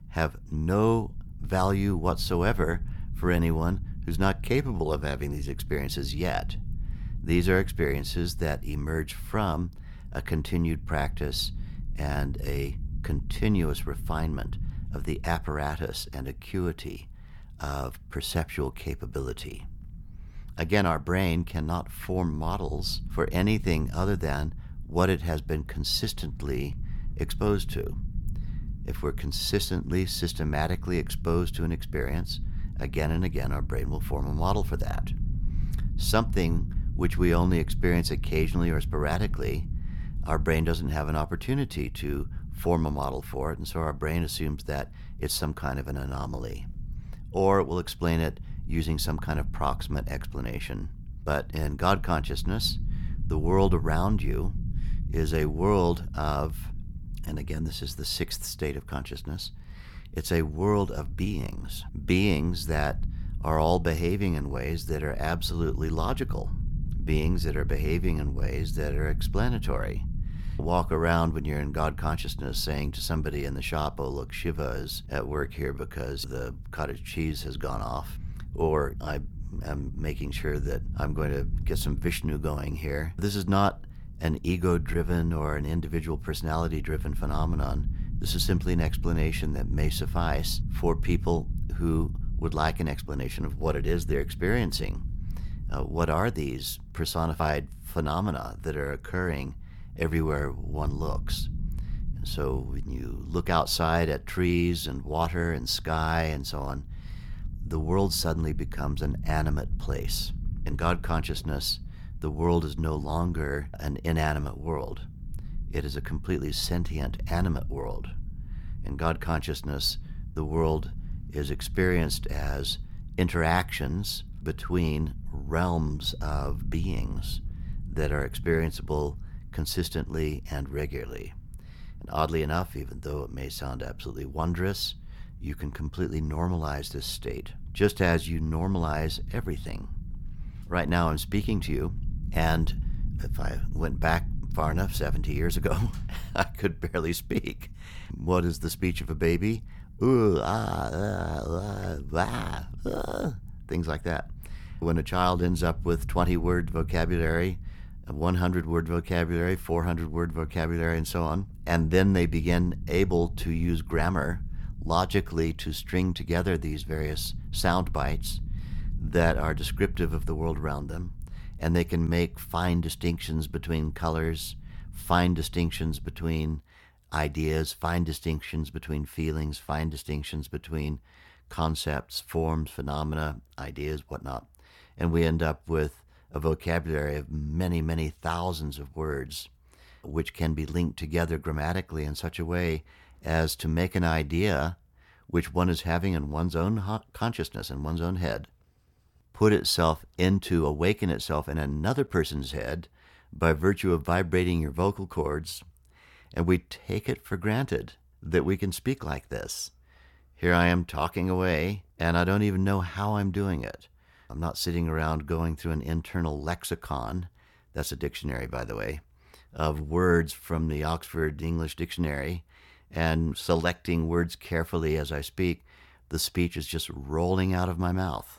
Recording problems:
low rumble; faint; until 2:56; 20 dB below the speech

